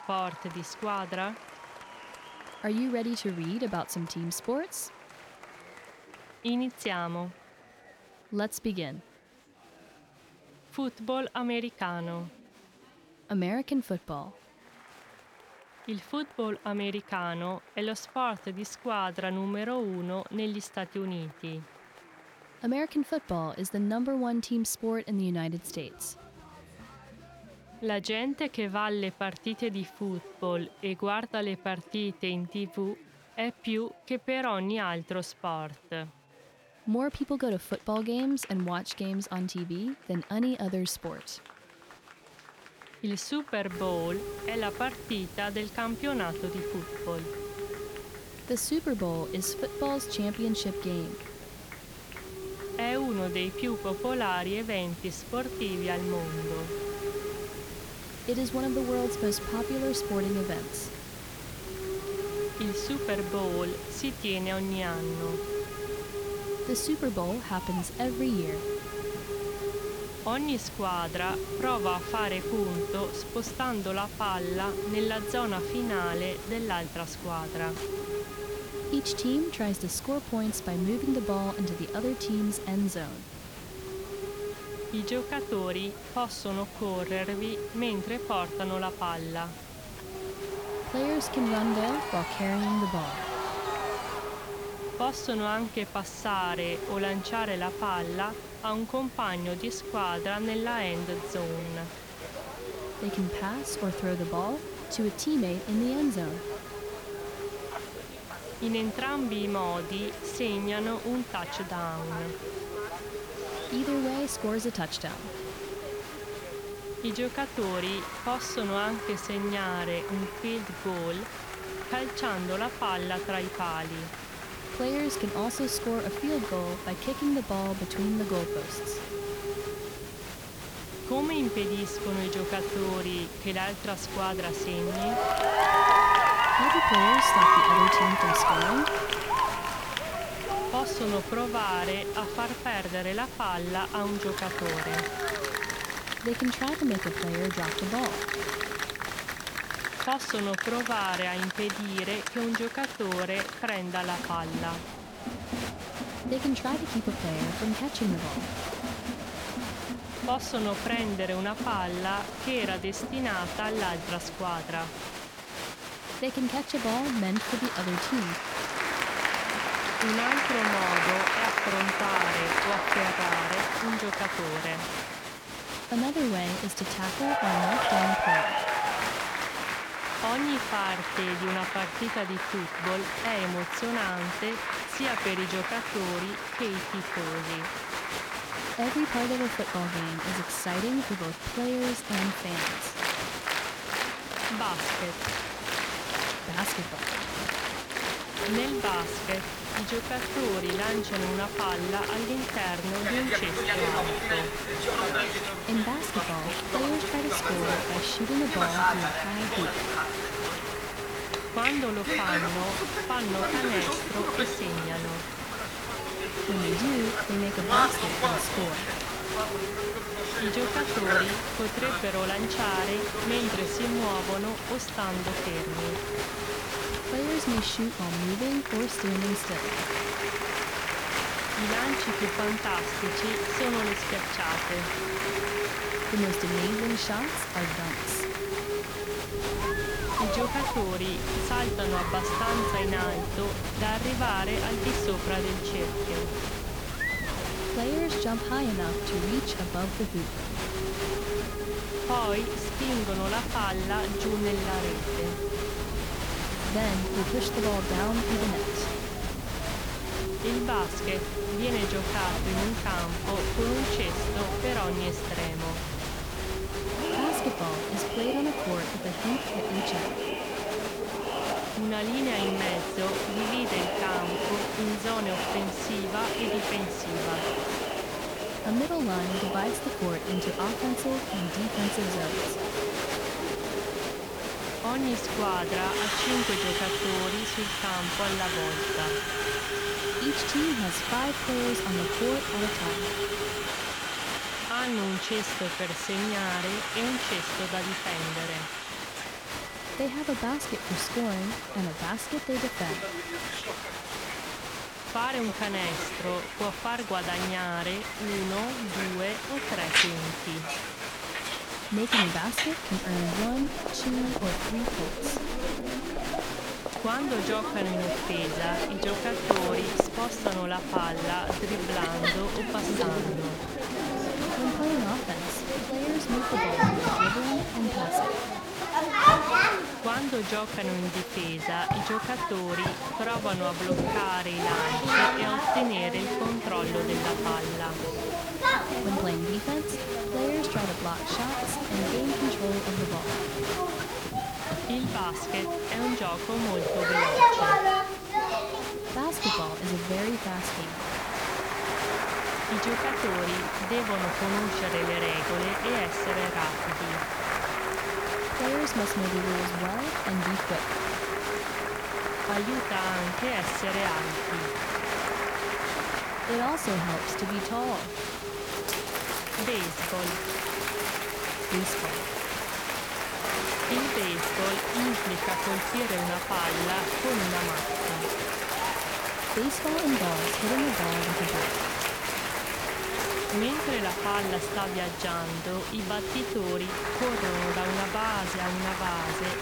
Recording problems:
crowd noise; very loud; throughout; 2 dB above the speech
hiss; loud; from 44 s to 2:30, from 3:18 to 4:54 and from 5:37 on; 5 dB below the speech
chatter from many people; faint; throughout; 30 dB below the speech

